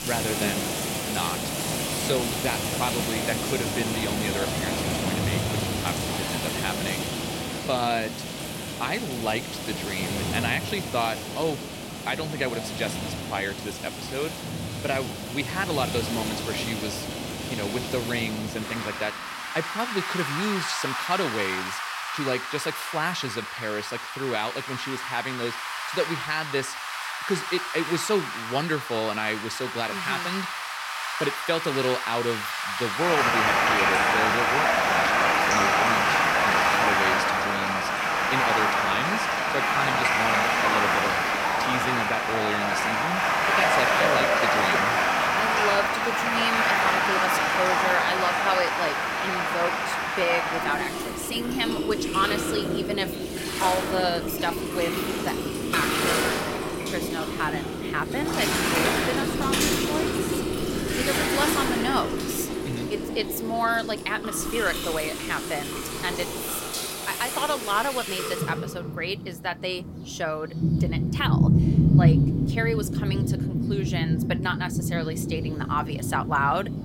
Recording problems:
rain or running water; very loud; throughout; 4 dB above the speech

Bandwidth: 16 kHz